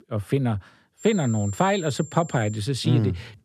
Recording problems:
high-pitched whine; noticeable; from 1 to 2.5 s; 7.5 kHz, 15 dB below the speech

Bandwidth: 13.5 kHz